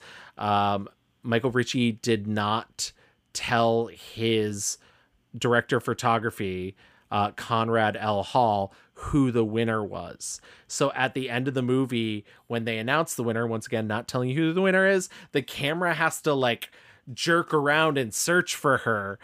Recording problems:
none

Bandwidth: 15 kHz